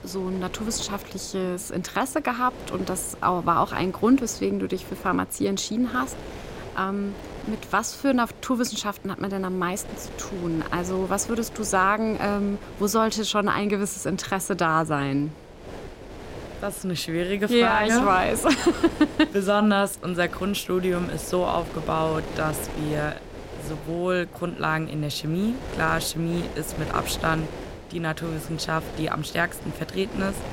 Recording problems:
wind noise on the microphone; occasional gusts; 15 dB below the speech

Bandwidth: 16 kHz